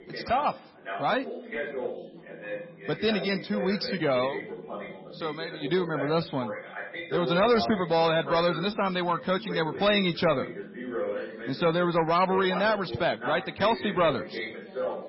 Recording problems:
garbled, watery; badly; nothing above 5.5 kHz
distortion; slight; 10 dB below the speech
background chatter; loud; throughout; 2 voices, 9 dB below the speech

